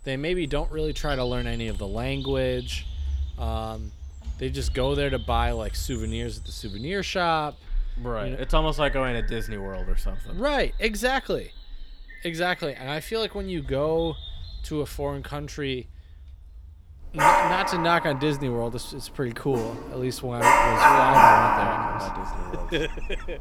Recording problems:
animal sounds; very loud; throughout; 4 dB above the speech

